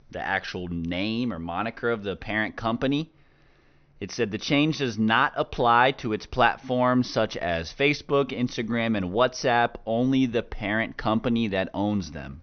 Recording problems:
high frequencies cut off; noticeable; nothing above 6 kHz

